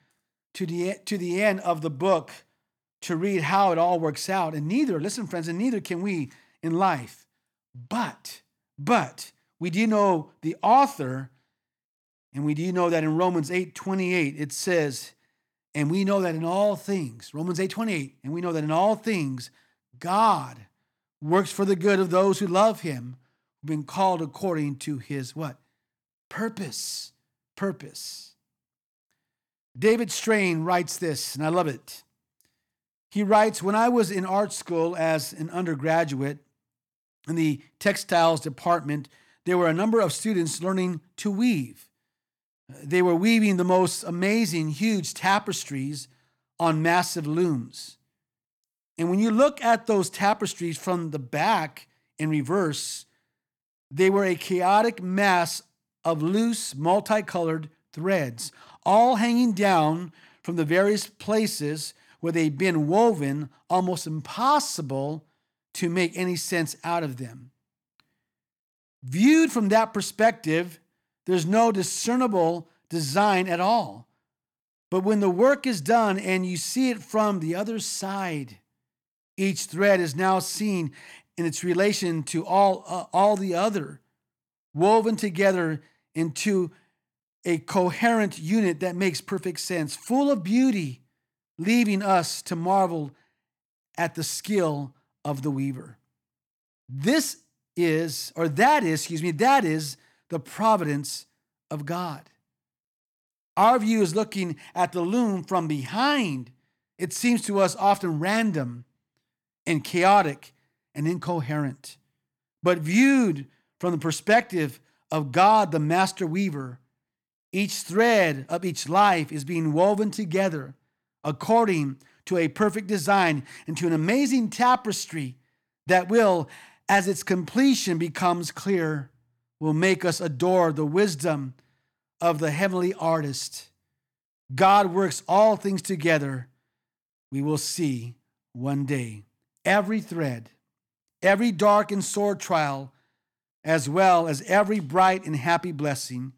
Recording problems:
none

